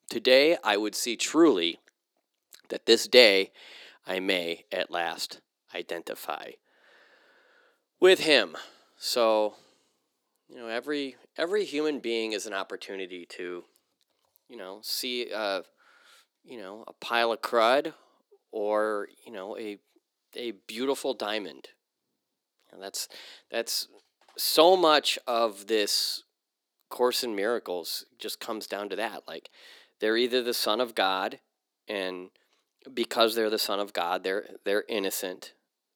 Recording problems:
thin; very; fading below 350 Hz

